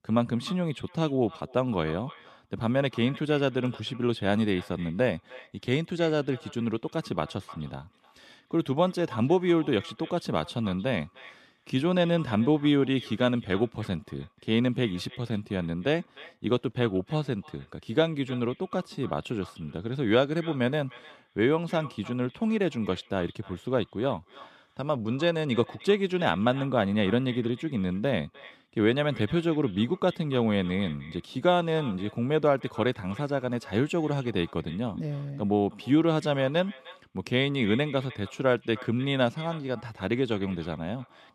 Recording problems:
echo of what is said; faint; throughout; 300 ms later, 20 dB below the speech

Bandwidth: 13.5 kHz